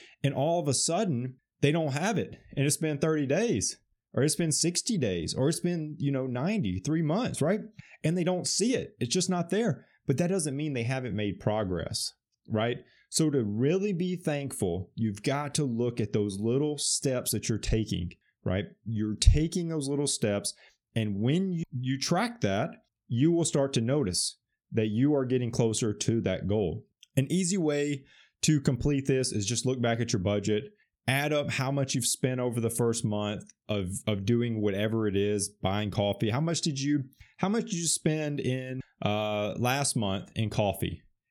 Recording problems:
none

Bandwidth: 18 kHz